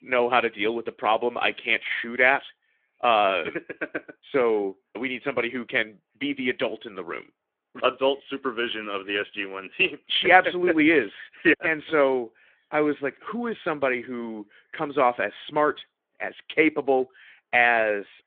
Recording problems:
phone-call audio; nothing above 3.5 kHz

